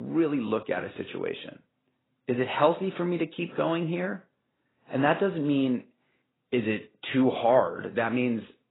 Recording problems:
garbled, watery; badly; nothing above 4 kHz
abrupt cut into speech; at the start

